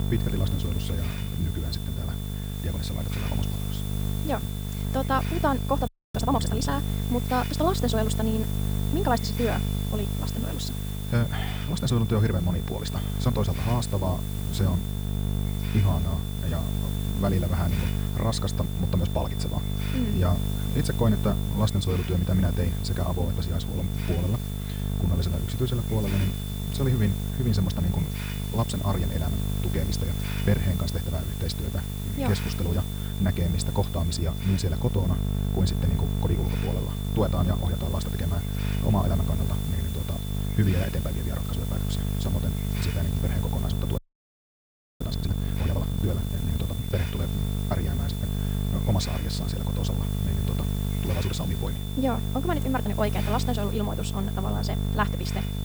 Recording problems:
wrong speed, natural pitch; too fast; 1.7 times normal speed
electrical hum; loud; throughout; 50 Hz, 7 dB below the speech
high-pitched whine; noticeable; throughout; 3.5 kHz, 15 dB below the speech
hiss; noticeable; throughout; 10 dB below the speech
audio freezing; at 6 s and at 44 s for 1 s

